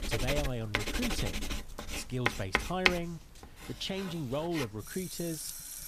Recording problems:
household noises; very loud; throughout; 2 dB above the speech

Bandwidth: 14.5 kHz